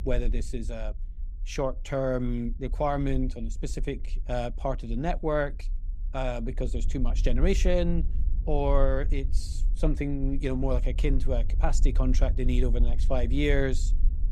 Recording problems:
low rumble; faint; throughout; 20 dB below the speech

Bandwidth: 15.5 kHz